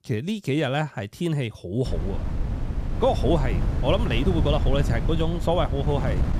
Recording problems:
wind noise on the microphone; occasional gusts; from 2 s on; 10 dB below the speech

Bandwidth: 14.5 kHz